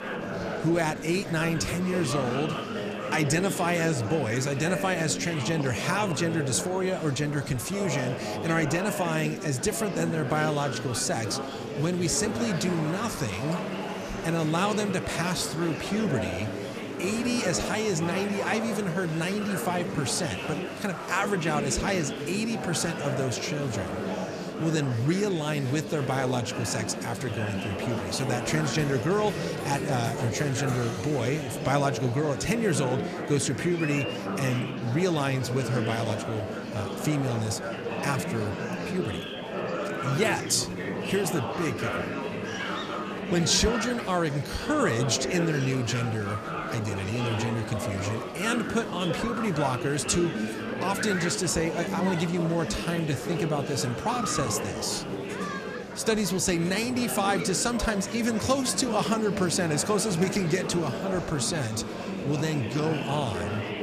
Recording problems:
murmuring crowd; loud; throughout; 4 dB below the speech

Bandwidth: 14.5 kHz